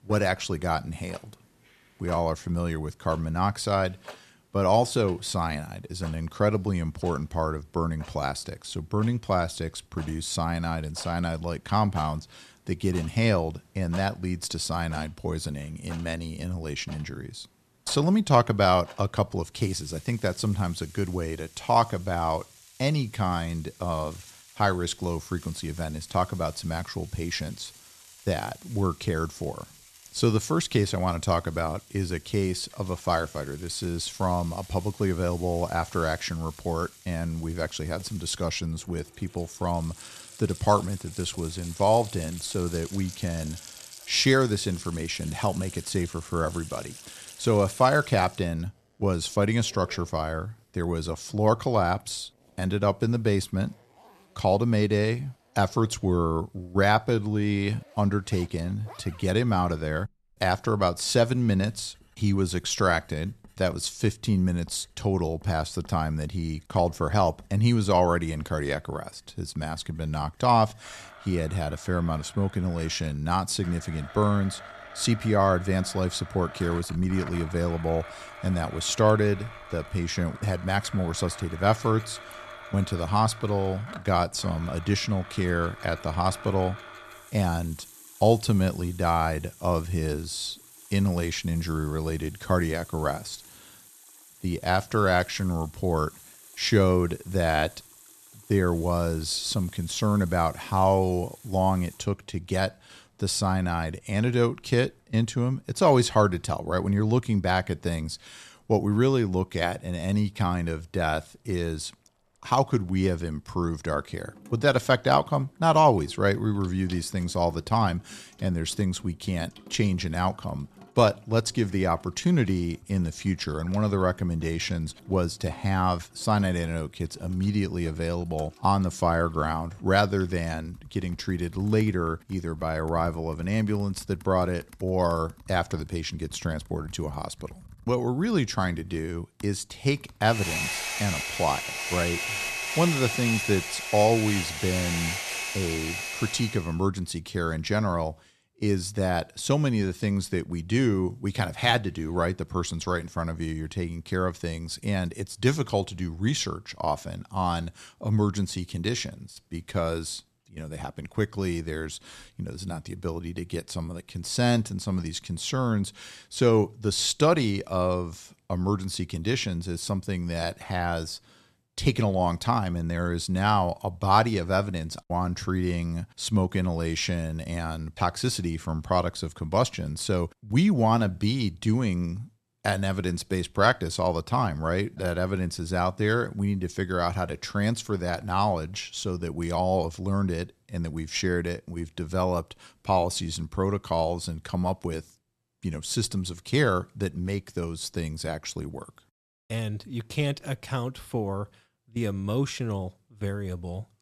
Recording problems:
household noises; noticeable; until 2:26; 15 dB below the speech

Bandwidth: 13.5 kHz